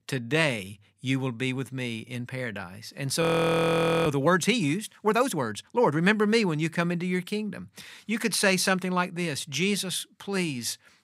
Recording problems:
audio freezing; at 3 s for 1 s

